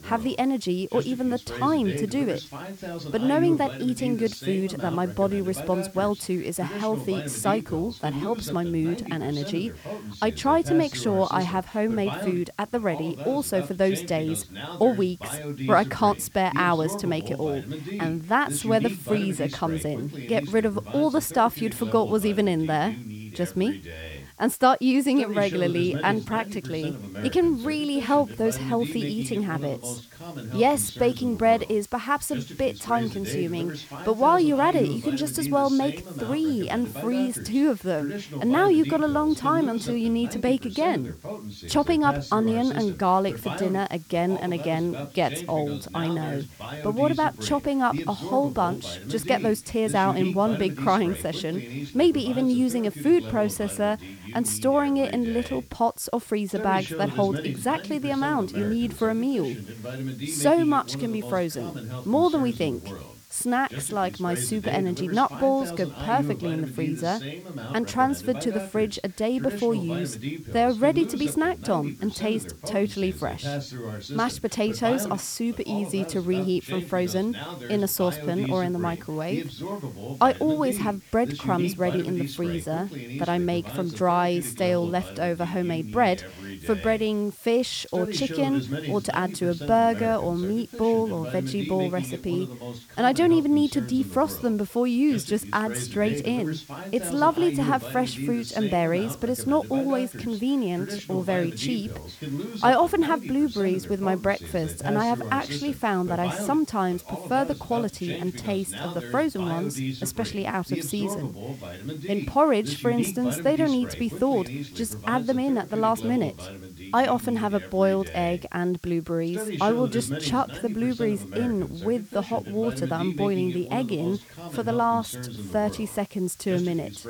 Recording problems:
voice in the background; loud; throughout; 10 dB below the speech
hiss; faint; throughout; 25 dB below the speech

